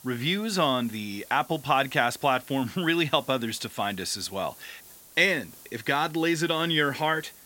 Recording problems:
hiss; faint; throughout; 20 dB below the speech

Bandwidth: 16.5 kHz